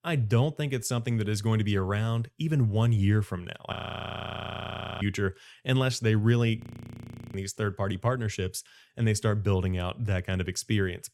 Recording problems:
audio freezing; at 3.5 s for 1.5 s and at 6.5 s for 1 s

